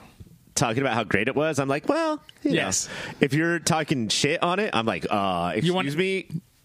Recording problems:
squashed, flat; heavily

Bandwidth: 15 kHz